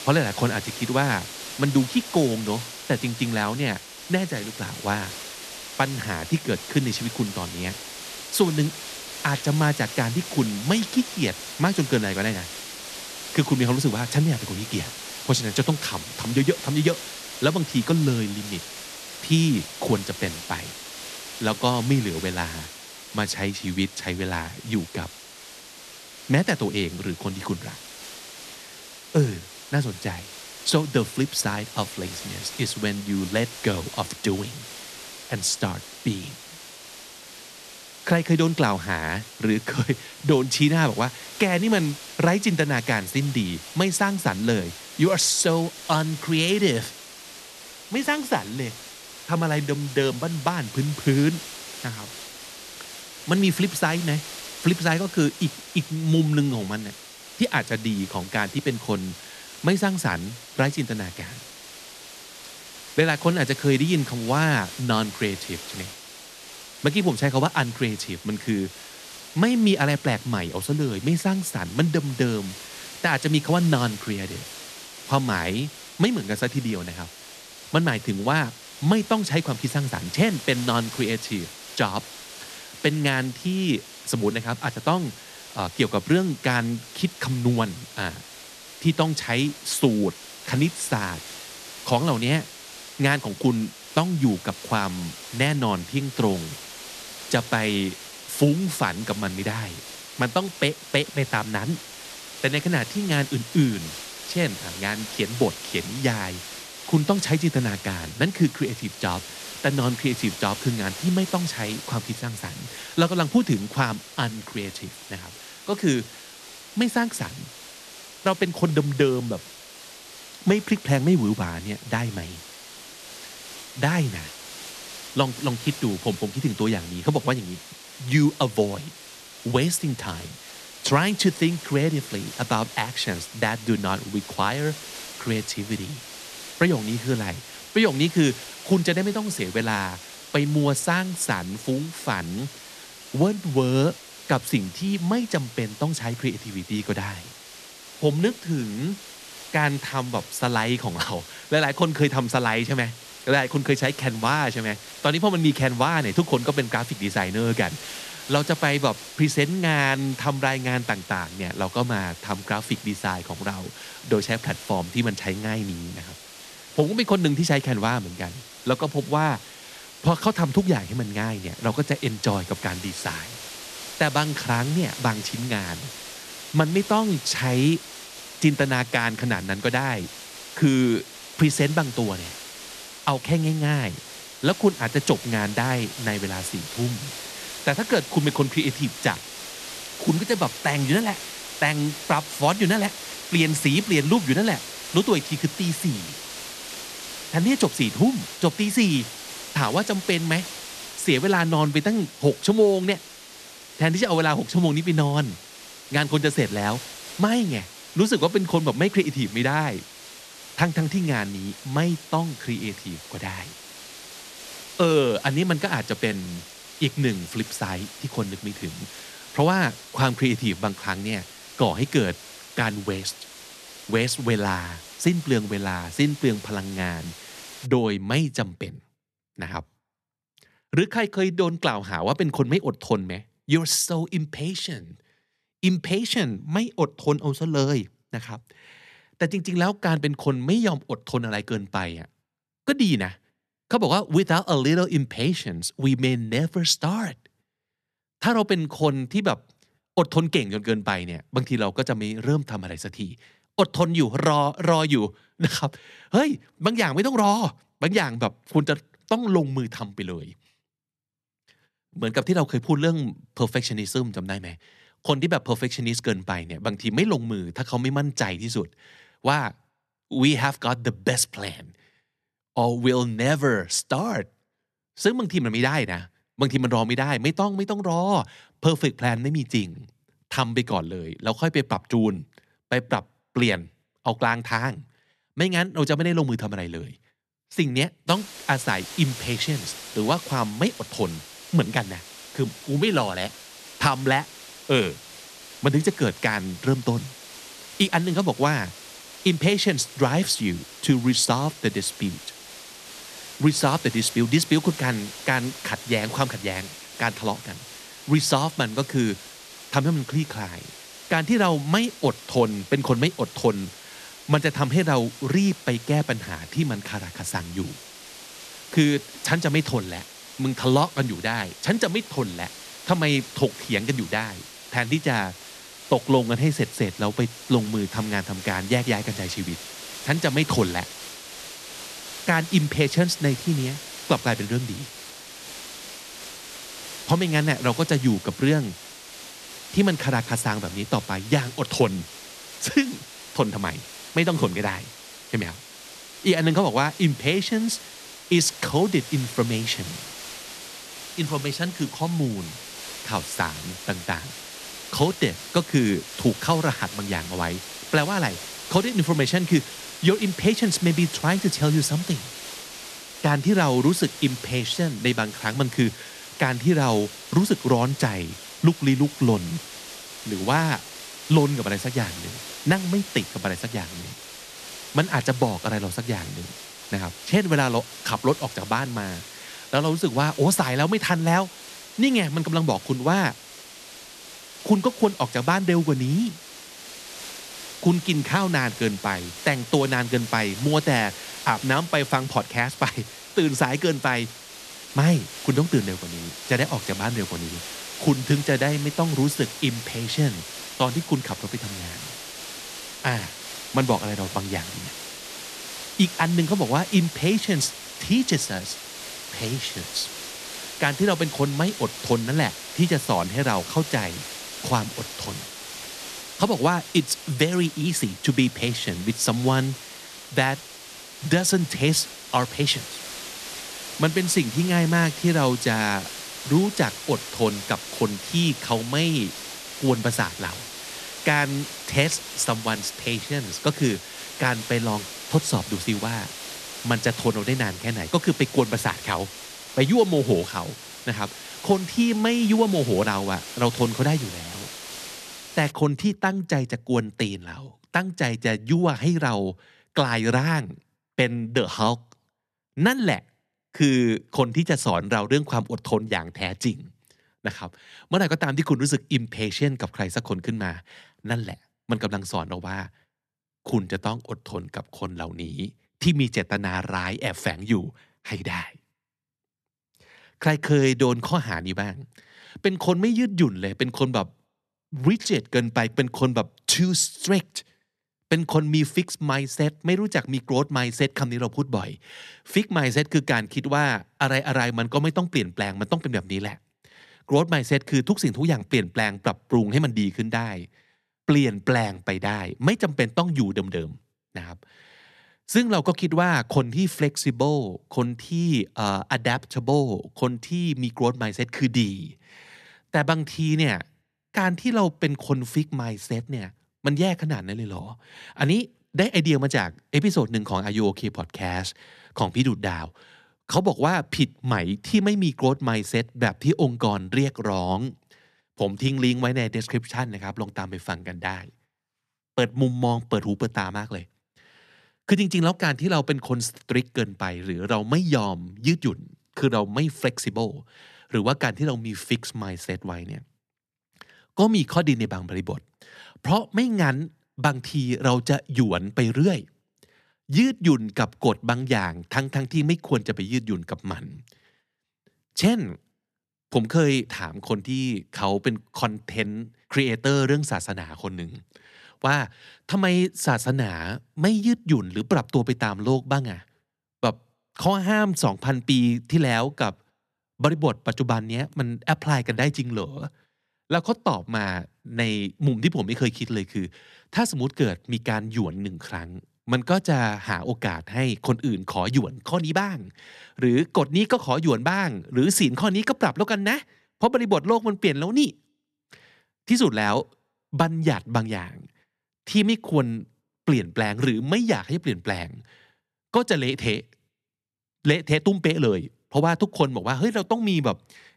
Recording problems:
hiss; noticeable; until 3:48 and from 4:48 to 7:26; 15 dB below the speech

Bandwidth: 13.5 kHz